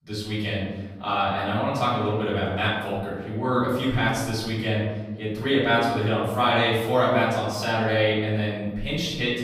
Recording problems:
off-mic speech; far
room echo; noticeable; dies away in 1.2 s

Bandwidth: 15.5 kHz